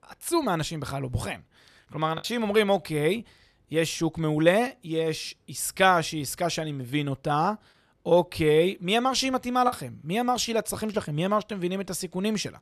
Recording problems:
choppy; occasionally; 1% of the speech affected

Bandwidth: 13.5 kHz